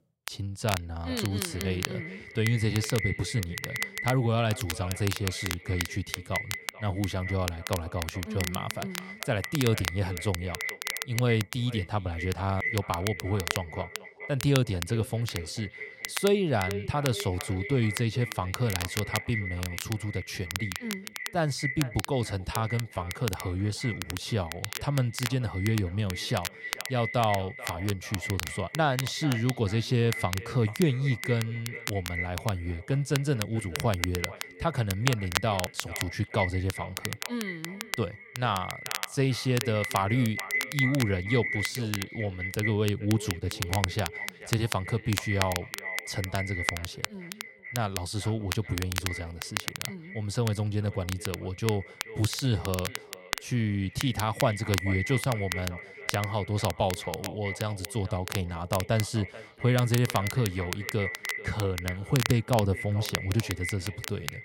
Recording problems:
echo of what is said; strong; throughout; 440 ms later, 9 dB below the speech
crackle, like an old record; loud; 7 dB below the speech

